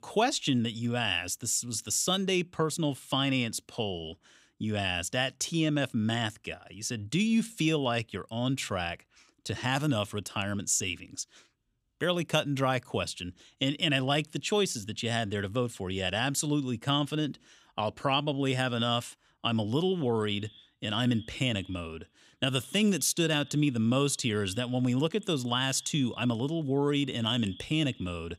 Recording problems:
echo of what is said; faint; from 20 s on; 80 ms later, 25 dB below the speech

